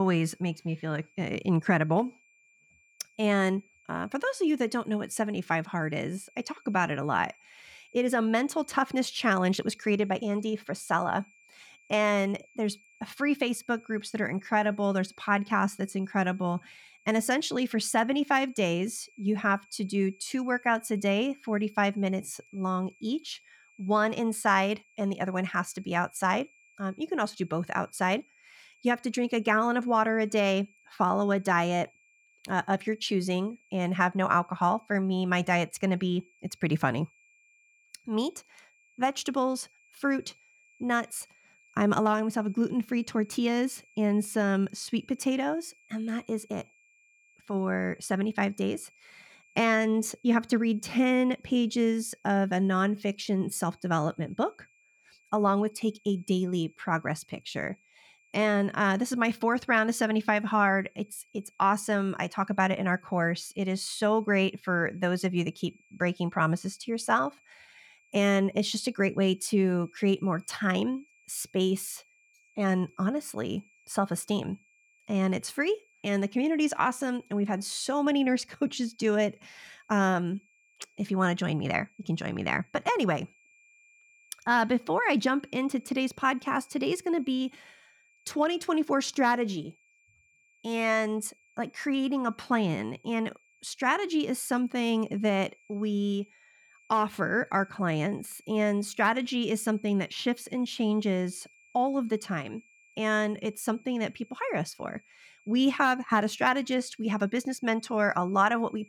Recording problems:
high-pitched whine; faint; throughout; 2.5 kHz, 30 dB below the speech
abrupt cut into speech; at the start

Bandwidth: 18.5 kHz